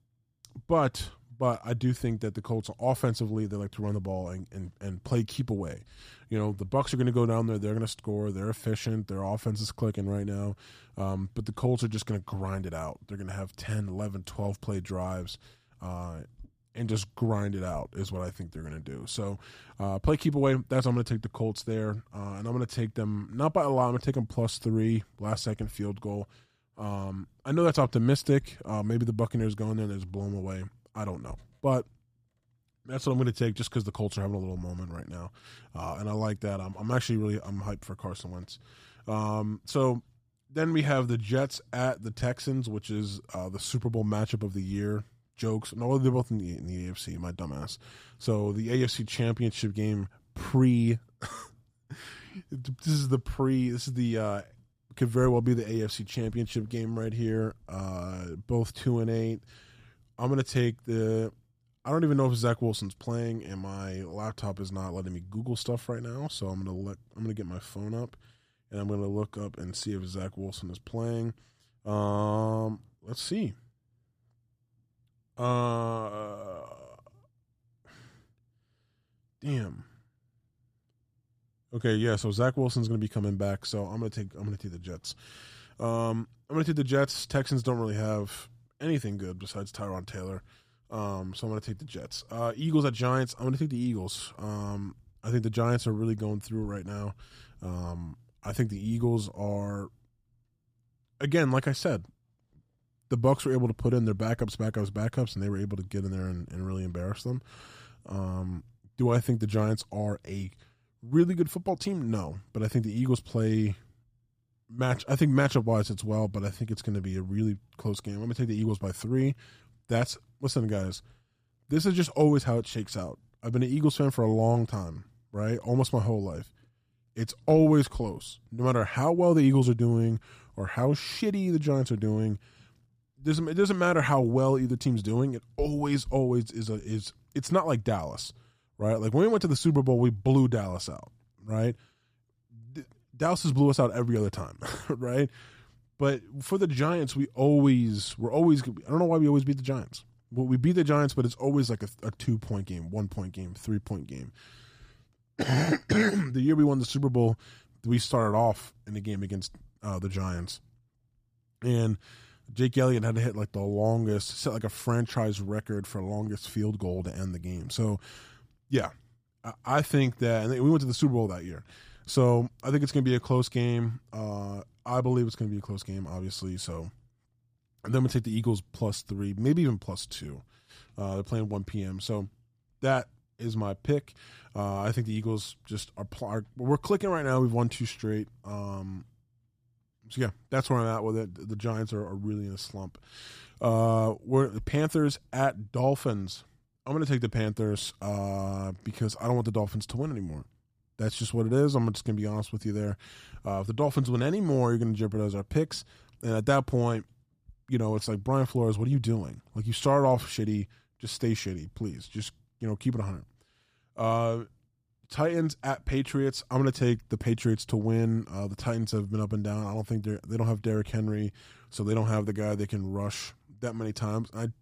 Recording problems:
none

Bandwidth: 15 kHz